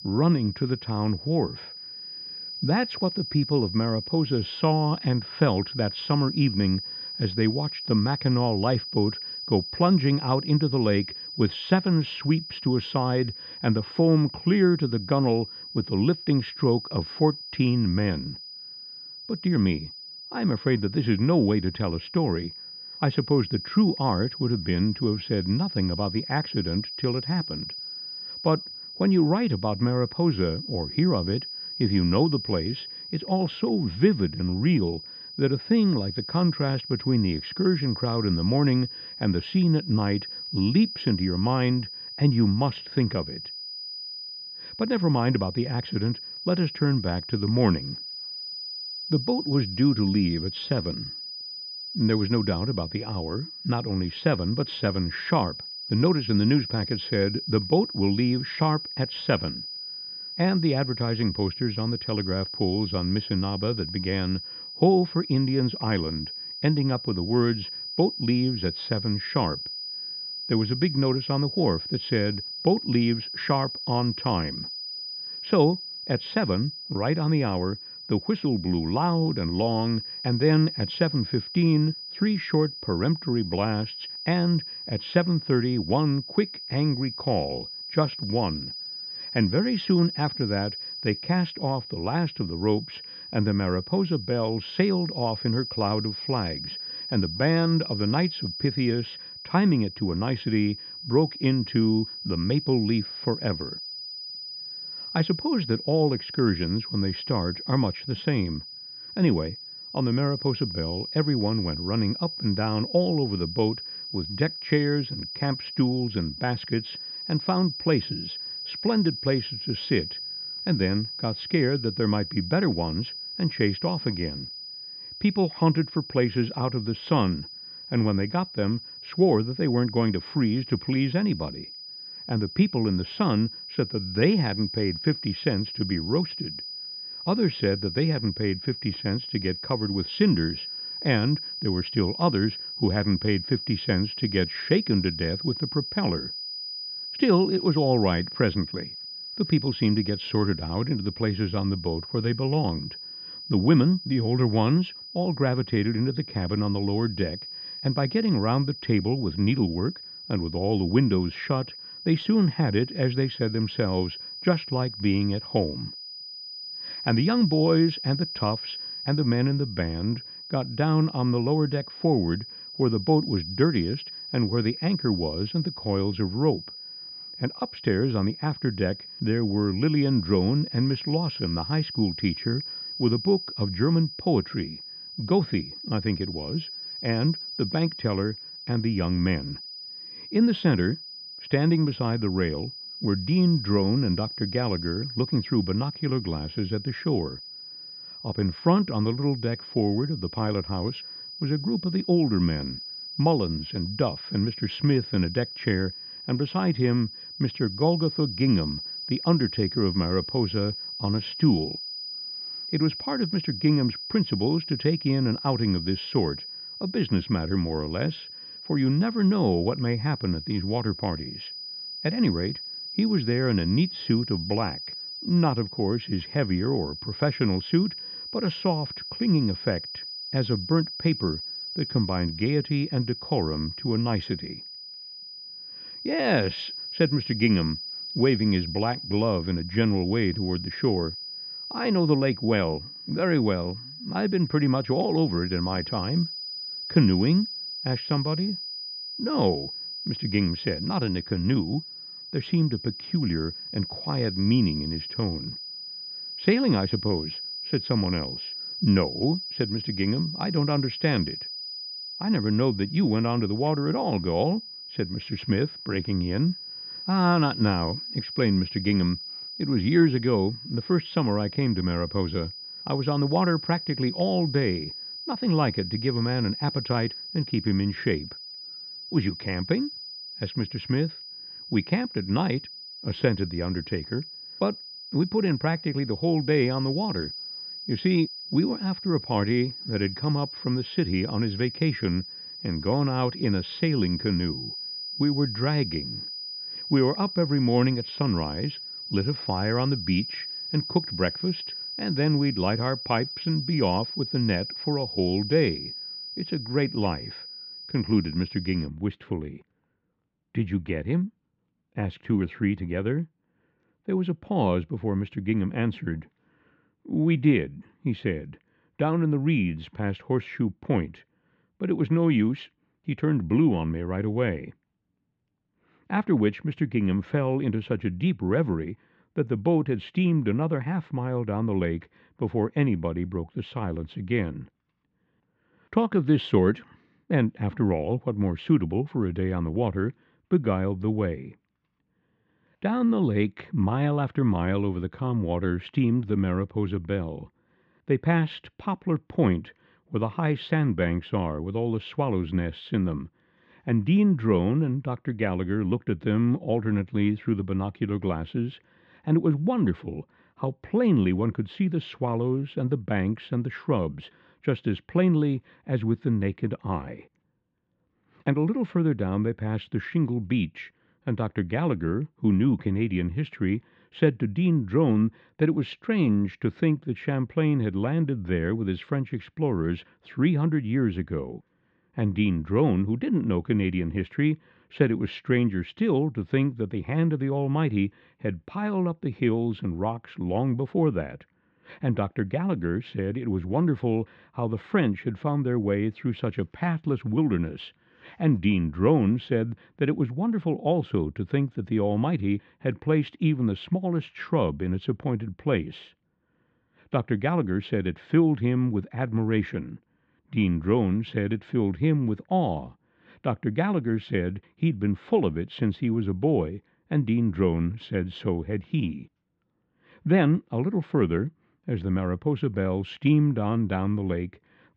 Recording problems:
muffled; very; fading above 3.5 kHz
high-pitched whine; loud; until 5:09; 5 kHz, 9 dB below the speech

